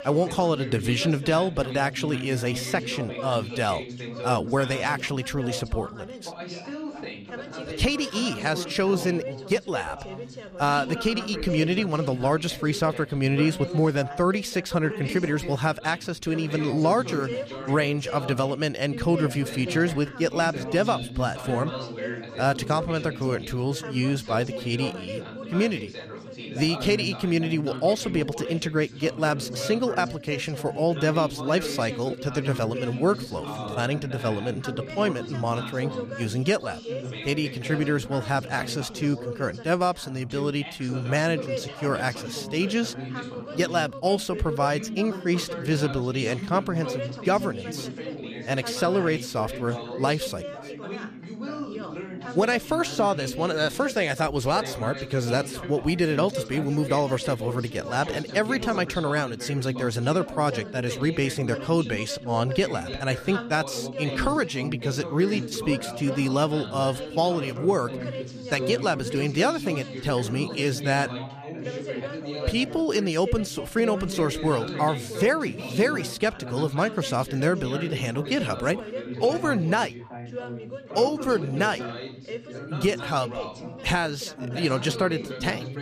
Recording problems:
background chatter; loud; throughout; 3 voices, 9 dB below the speech

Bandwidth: 14.5 kHz